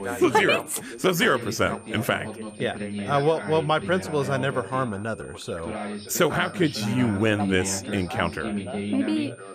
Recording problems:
background chatter; loud; throughout; 3 voices, 8 dB below the speech
high-pitched whine; faint; throughout; 9 kHz, 25 dB below the speech

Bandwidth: 14.5 kHz